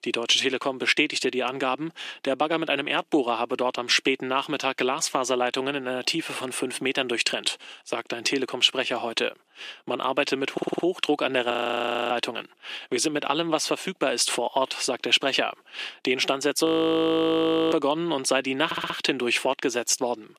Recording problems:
thin; somewhat; fading below 300 Hz
audio stuttering; at 11 s and at 19 s
audio freezing; at 12 s for 0.5 s and at 17 s for 1 s

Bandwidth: 14.5 kHz